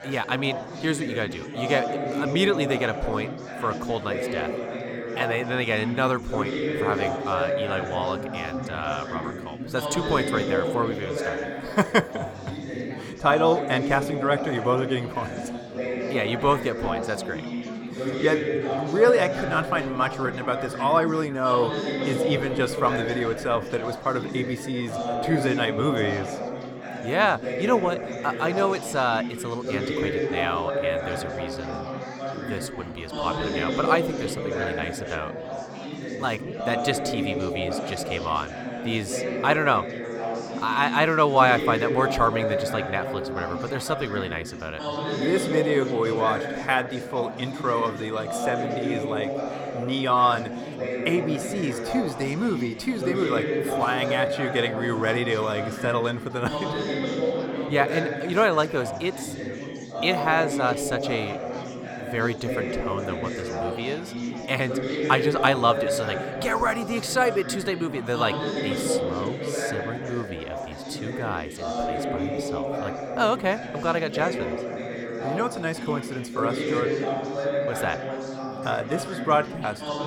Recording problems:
chatter from many people; loud; throughout; 4 dB below the speech

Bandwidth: 17.5 kHz